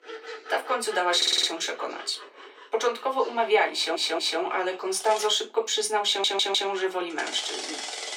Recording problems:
off-mic speech; far
thin; very; fading below 350 Hz
room echo; very slight; dies away in 0.2 s
machinery noise; noticeable; throughout; 15 dB below the speech
voice in the background; faint; throughout; 30 dB below the speech
audio stuttering; at 1 s, at 3.5 s and at 6 s

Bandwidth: 16.5 kHz